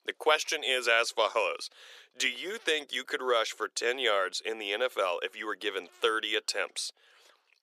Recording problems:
thin; very; fading below 400 Hz

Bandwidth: 14.5 kHz